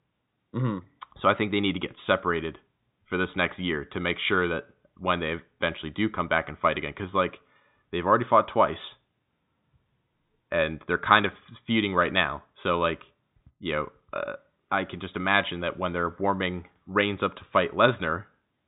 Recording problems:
high frequencies cut off; severe; nothing above 4 kHz

